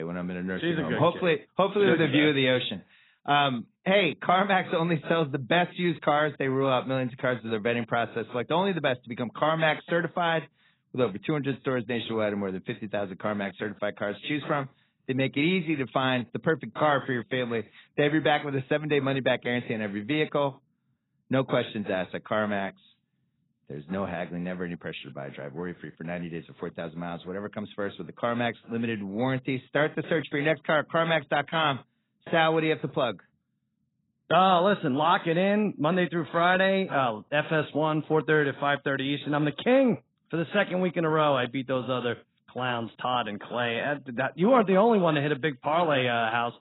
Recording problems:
garbled, watery; badly; nothing above 4 kHz
abrupt cut into speech; at the start

